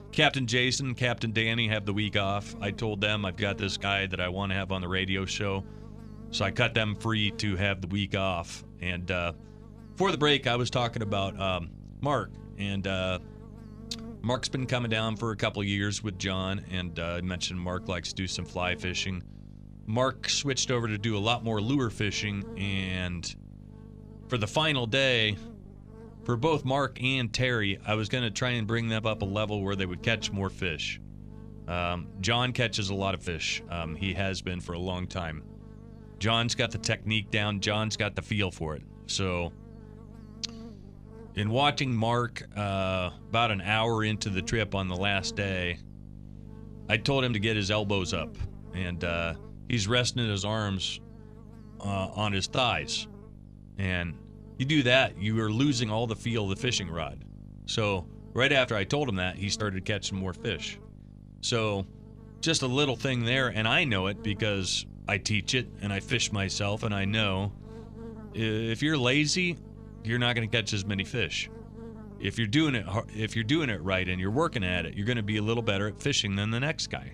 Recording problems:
electrical hum; faint; throughout; 50 Hz, 25 dB below the speech

